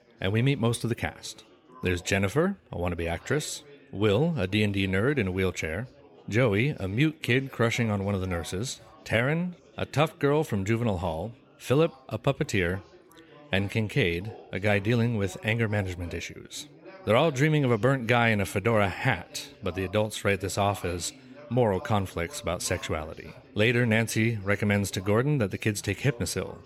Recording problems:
chatter from many people; faint; throughout; 25 dB below the speech

